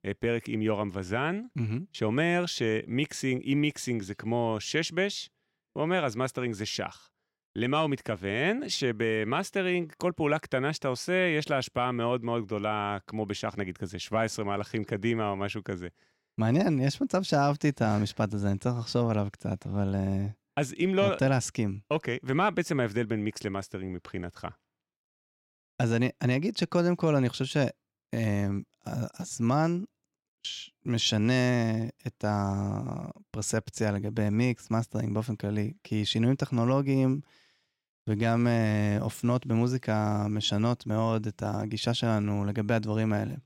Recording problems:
none

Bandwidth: 16 kHz